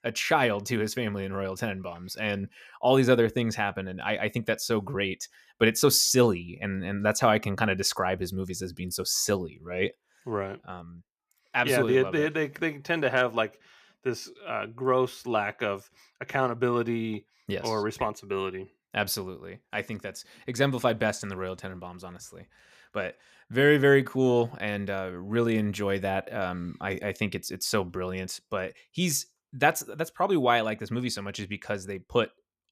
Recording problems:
none

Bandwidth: 14.5 kHz